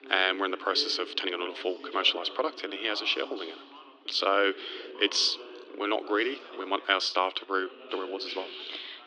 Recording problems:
thin; very; fading below 300 Hz
muffled; very slightly; fading above 3.5 kHz
background chatter; noticeable; throughout; 4 voices, 15 dB below the speech
uneven, jittery; strongly; from 1 to 8.5 s

